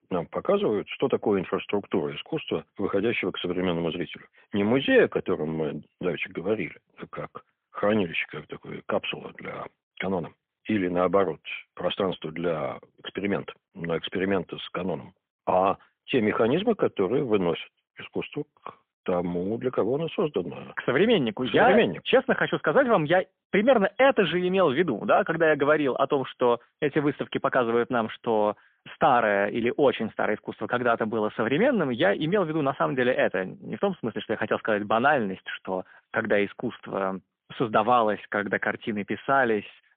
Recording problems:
phone-call audio; poor line; nothing above 3.5 kHz

